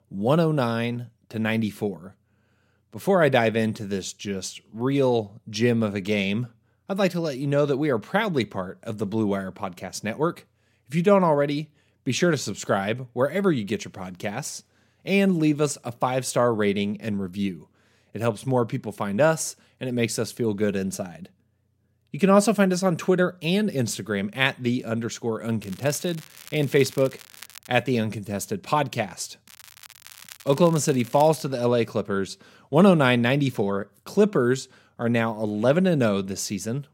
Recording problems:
crackling; noticeable; from 26 to 28 s and from 29 to 31 s; 20 dB below the speech

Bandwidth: 16 kHz